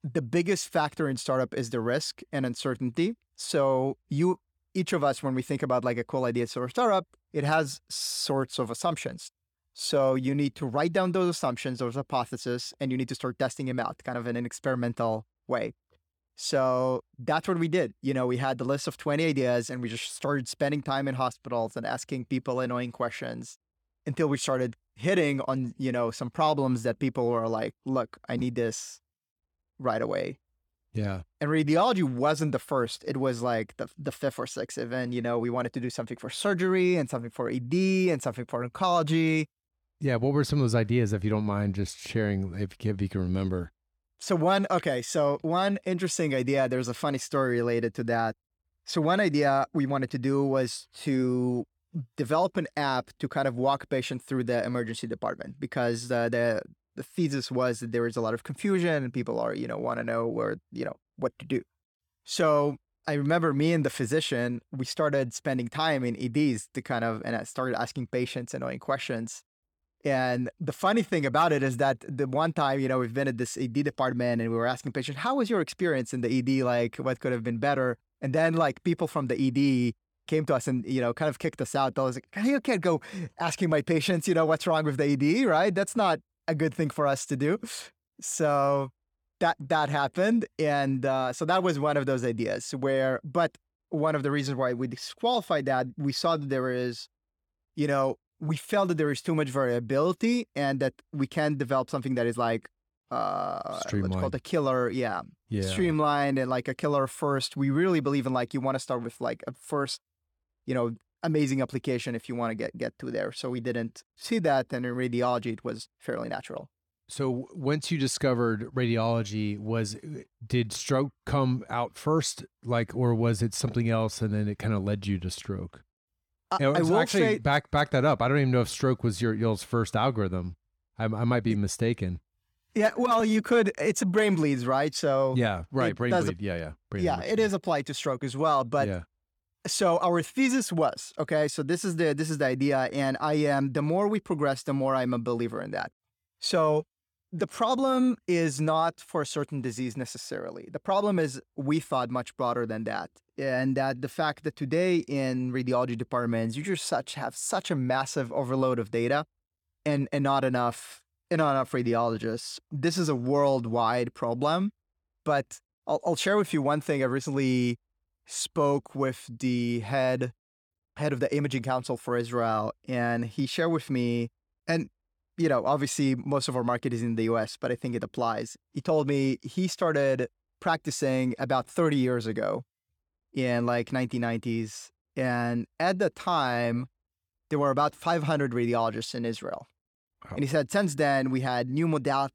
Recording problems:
uneven, jittery; strongly; from 9.5 s to 1:58

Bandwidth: 18.5 kHz